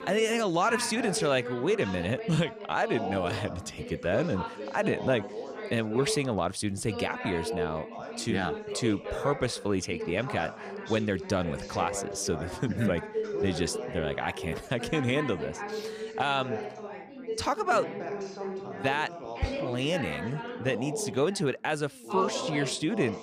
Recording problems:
background chatter; loud; throughout; 3 voices, 7 dB below the speech

